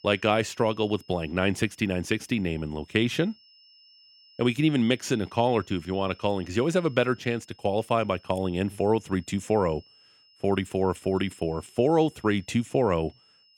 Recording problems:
high-pitched whine; faint; throughout; 5 kHz, 30 dB below the speech

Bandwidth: 18.5 kHz